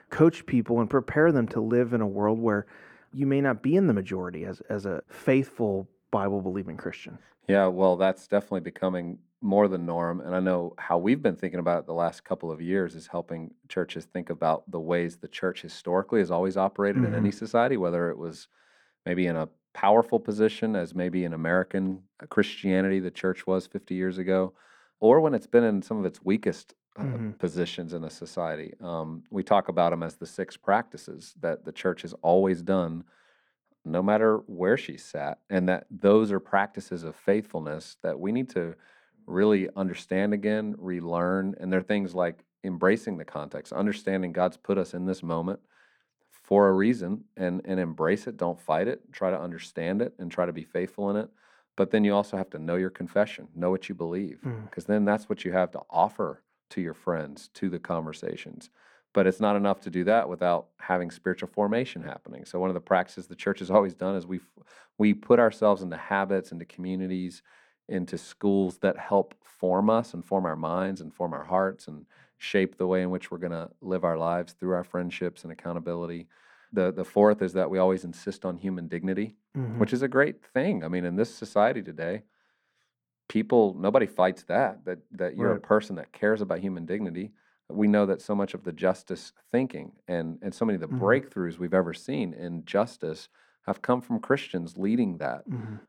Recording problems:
muffled; very; fading above 3 kHz

